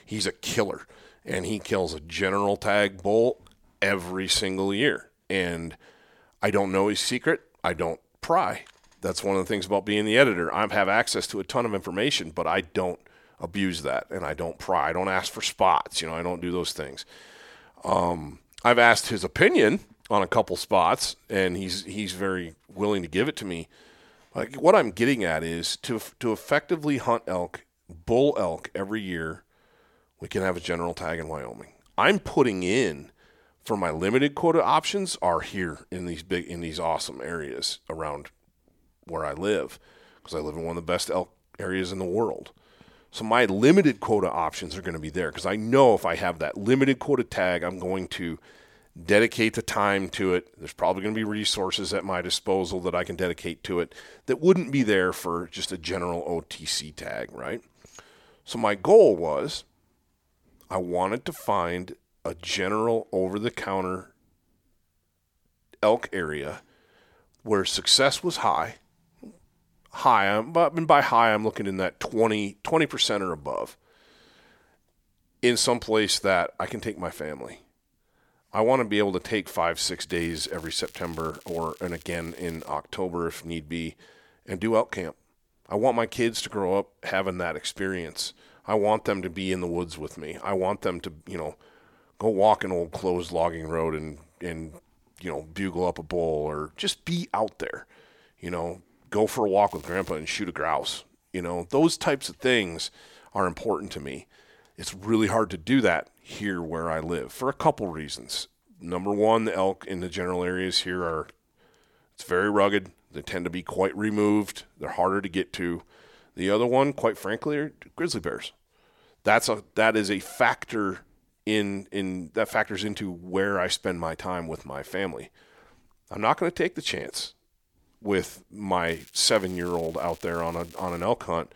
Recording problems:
crackling; faint; from 1:20 to 1:23, at 1:40 and from 2:09 to 2:11; 25 dB below the speech

